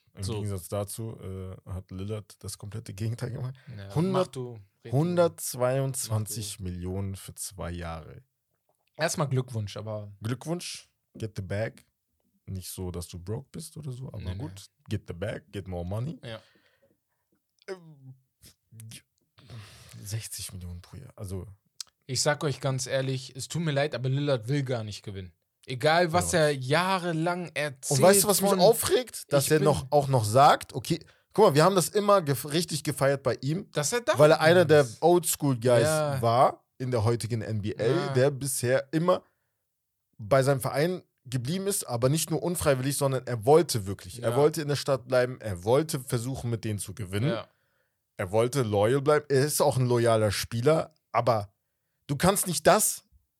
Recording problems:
none

